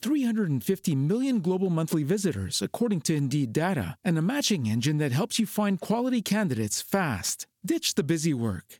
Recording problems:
squashed, flat; somewhat

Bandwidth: 18 kHz